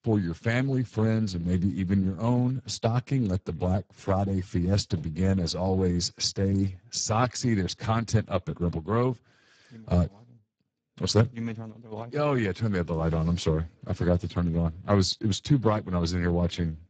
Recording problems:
garbled, watery; badly; nothing above 7.5 kHz

